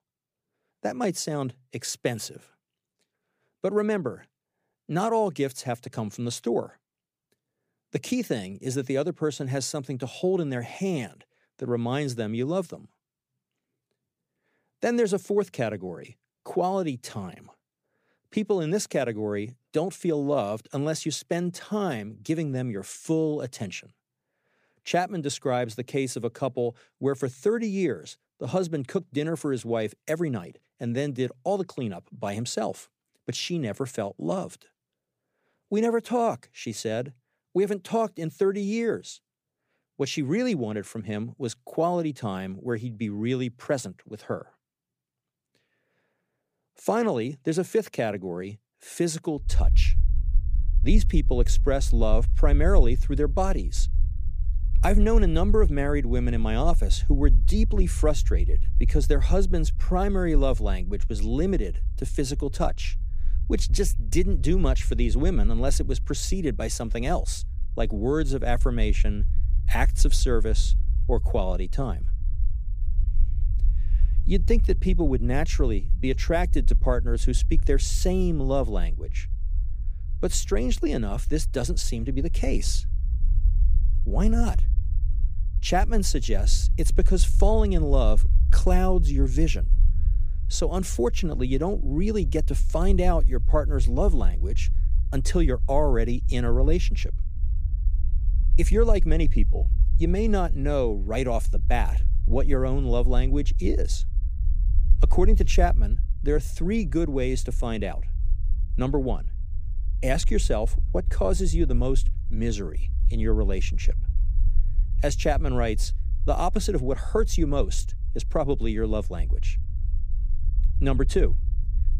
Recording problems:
low rumble; noticeable; from 49 s on; 20 dB below the speech

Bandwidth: 15 kHz